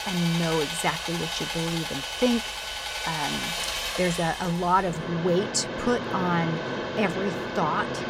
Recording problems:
machinery noise; loud; throughout; 3 dB below the speech

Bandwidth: 16 kHz